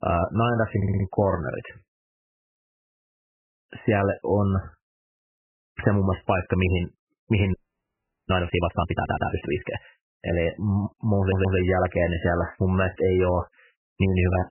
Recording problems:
garbled, watery; badly; nothing above 3 kHz
audio stuttering; at 1 s, at 9 s and at 11 s
audio freezing; at 7.5 s for 0.5 s

